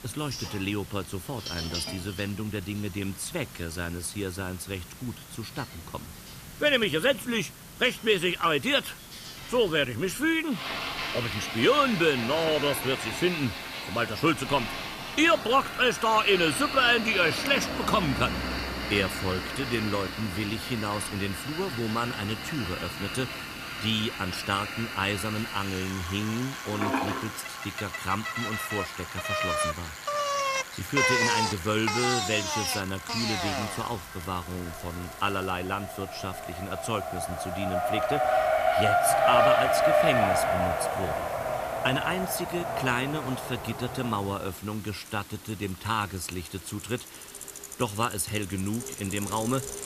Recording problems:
household noises; loud; throughout; 7 dB below the speech
traffic noise; loud; throughout; 1 dB below the speech
hiss; noticeable; throughout; 15 dB below the speech
crackling; faint; at 25 s and from 34 to 36 s; 20 dB below the speech

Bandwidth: 14.5 kHz